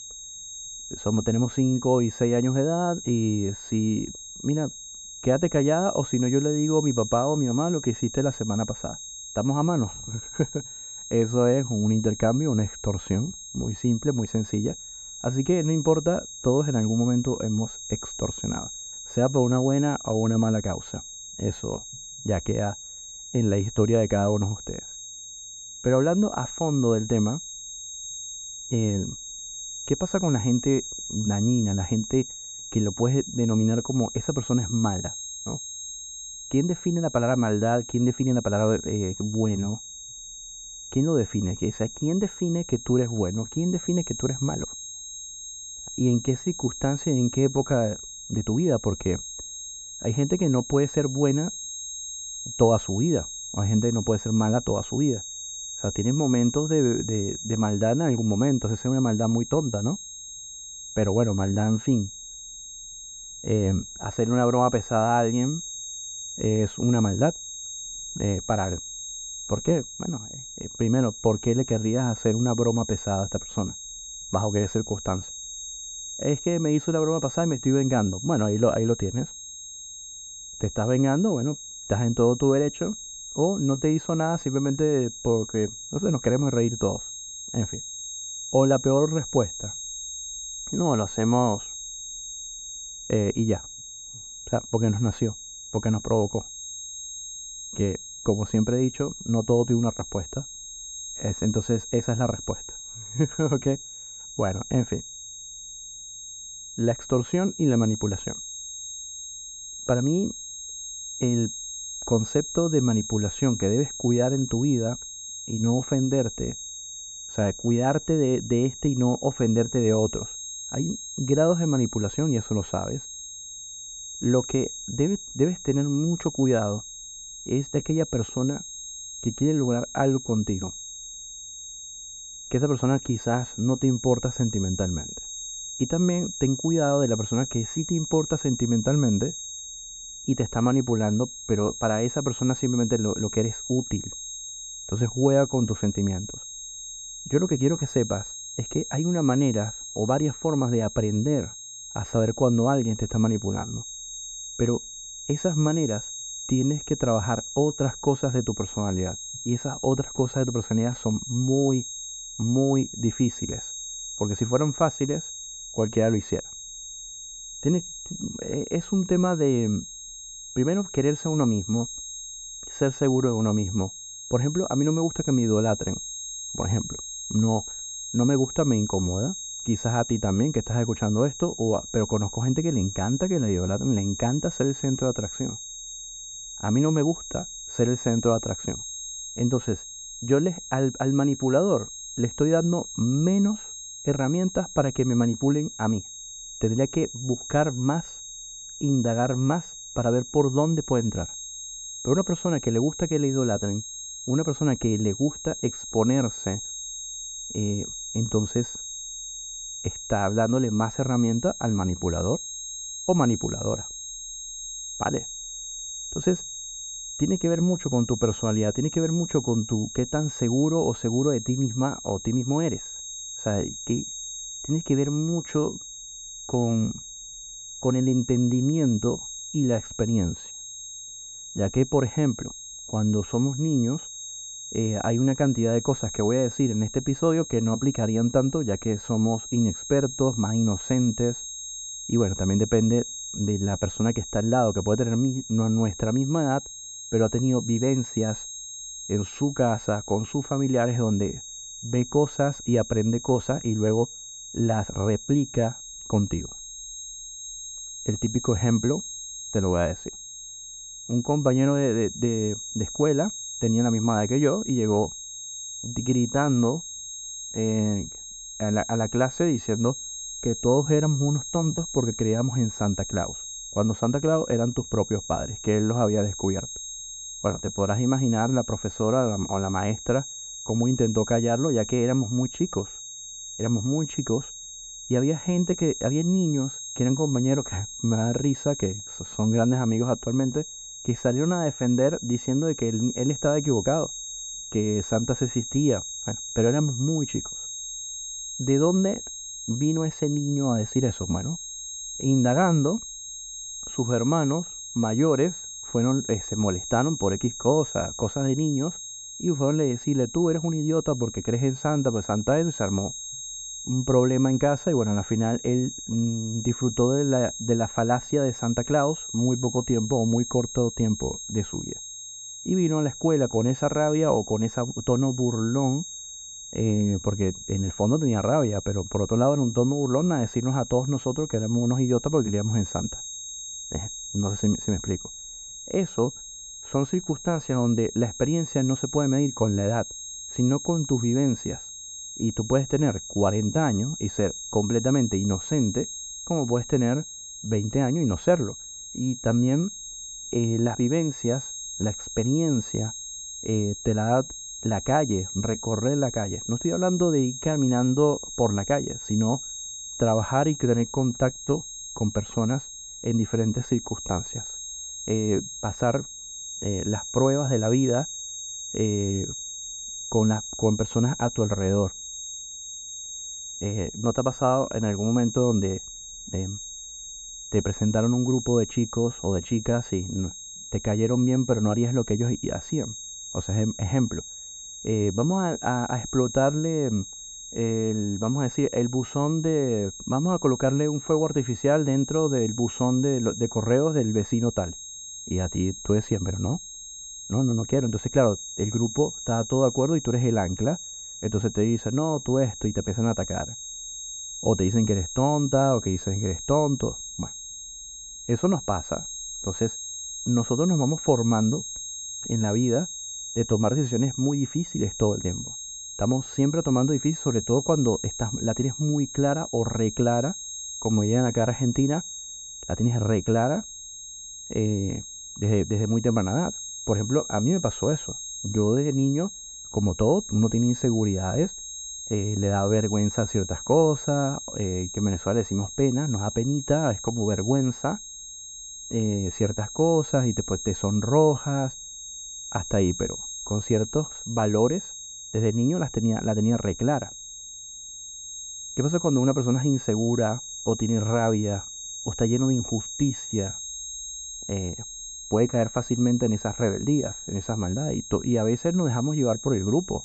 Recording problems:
muffled; very; fading above 2.5 kHz
high-pitched whine; loud; throughout; 6.5 kHz, 10 dB below the speech

